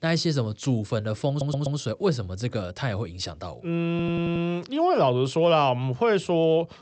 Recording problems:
high frequencies cut off; noticeable; nothing above 8 kHz
audio stuttering; at 1.5 s and at 4 s

